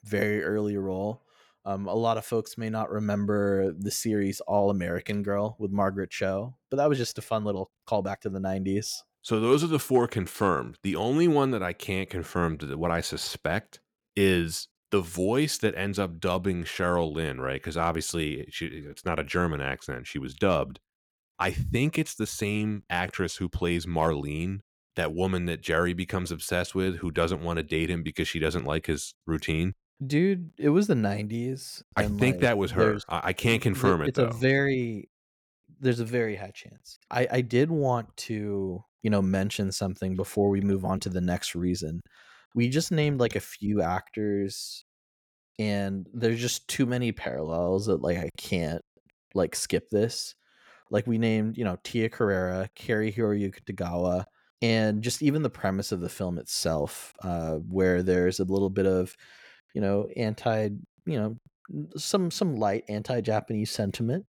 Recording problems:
uneven, jittery; strongly; from 7.5 s to 1:00

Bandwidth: 18.5 kHz